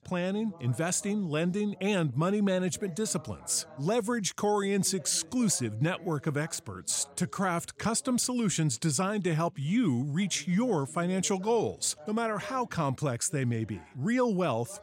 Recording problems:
background chatter; faint; throughout; 2 voices, 25 dB below the speech

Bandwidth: 16 kHz